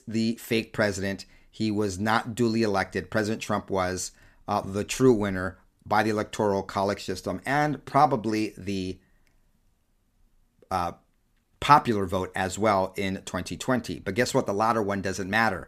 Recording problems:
none

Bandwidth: 14.5 kHz